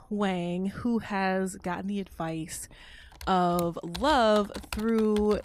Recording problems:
household noises; noticeable; throughout; 15 dB below the speech

